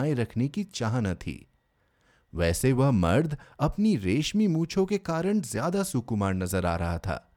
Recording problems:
abrupt cut into speech; at the start

